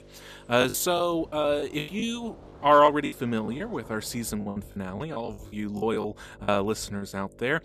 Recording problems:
electrical hum; faint; throughout; 50 Hz, 30 dB below the speech
rain or running water; faint; throughout; 25 dB below the speech
choppy; very; from 0.5 to 3.5 s and from 4.5 to 7 s; 15% of the speech affected

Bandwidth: 14.5 kHz